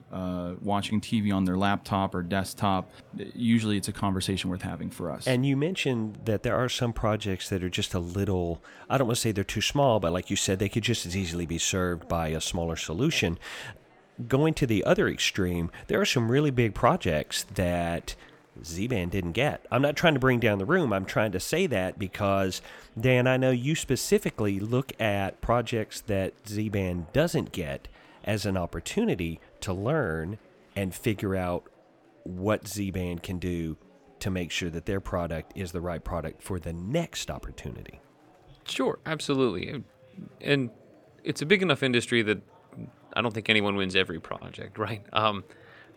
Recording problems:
murmuring crowd; faint; throughout; 30 dB below the speech

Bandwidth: 17 kHz